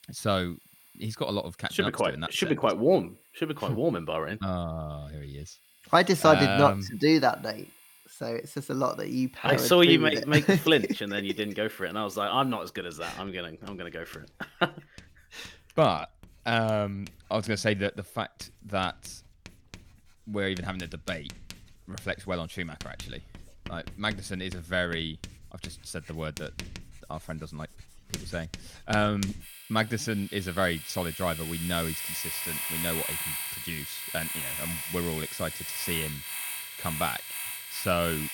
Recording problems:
household noises; loud; throughout; 7 dB below the speech

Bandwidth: 17.5 kHz